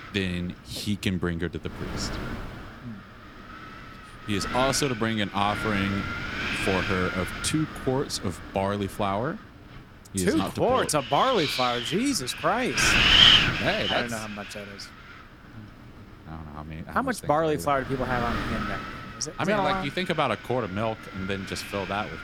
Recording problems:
wind noise on the microphone; heavy; 3 dB above the speech

